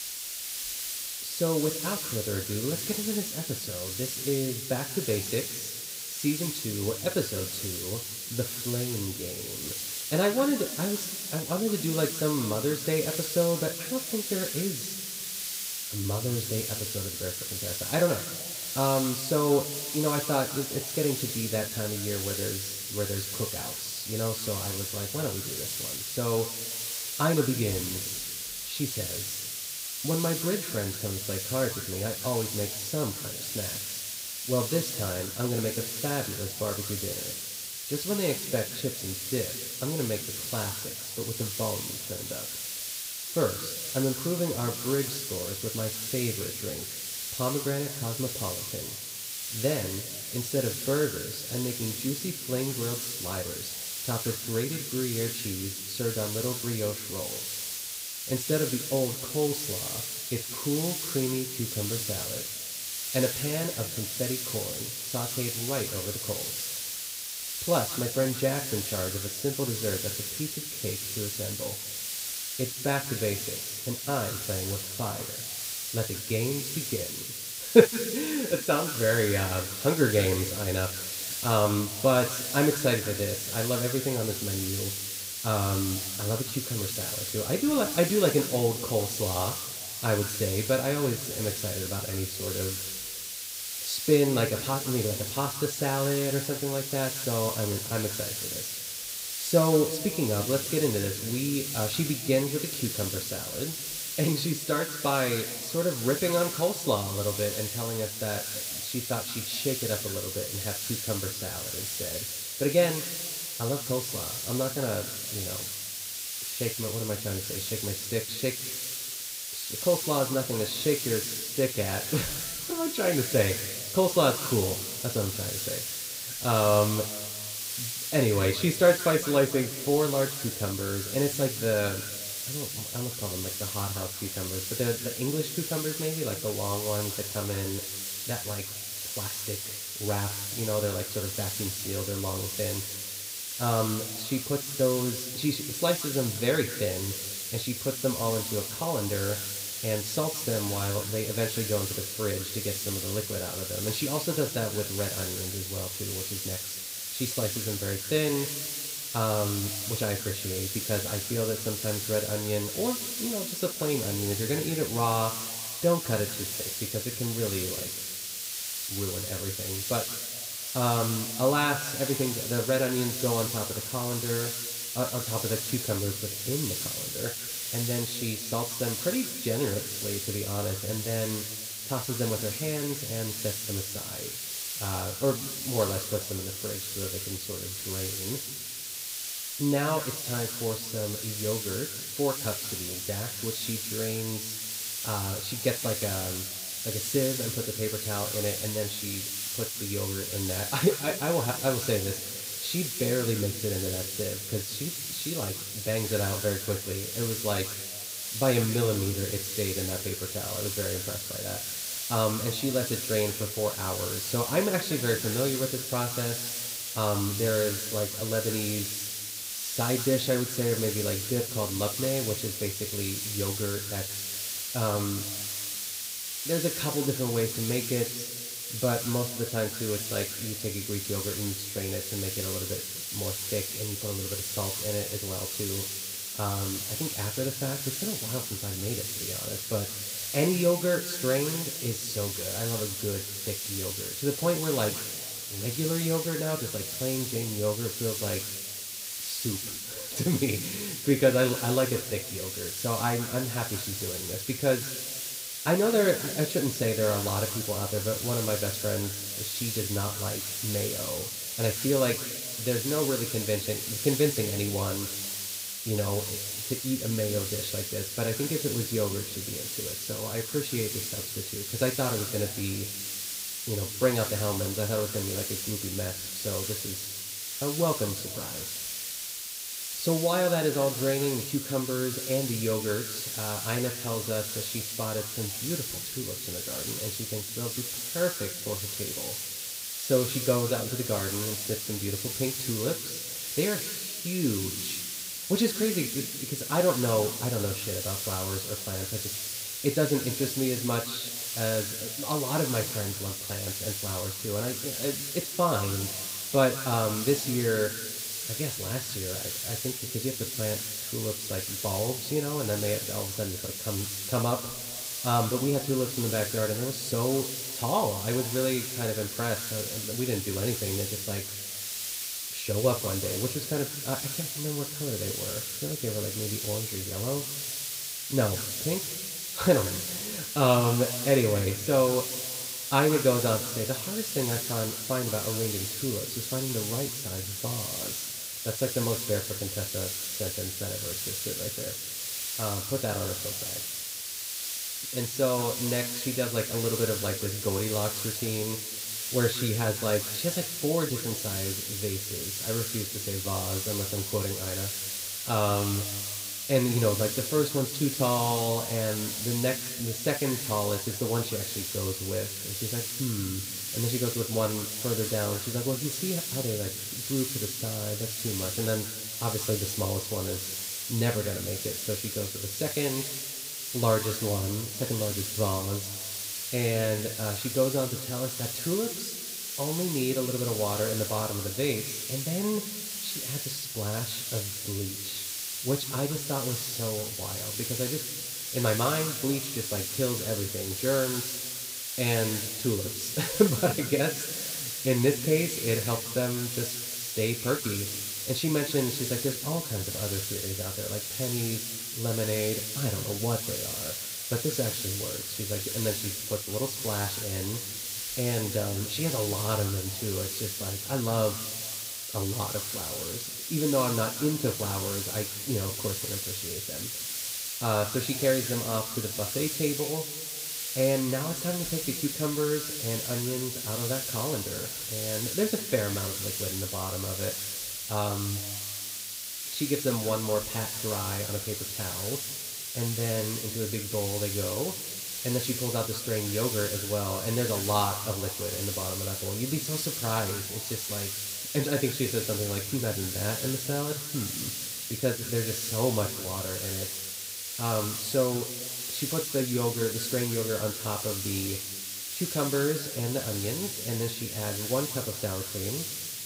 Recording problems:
room echo; noticeable; dies away in 1.3 s
off-mic speech; somewhat distant
hiss; loud; throughout; 2 dB below the speech

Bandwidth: 15.5 kHz